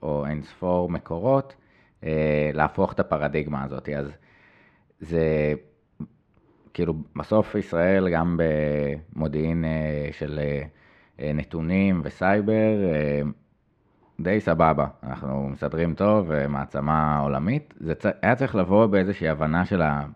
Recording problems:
muffled; slightly; fading above 2.5 kHz

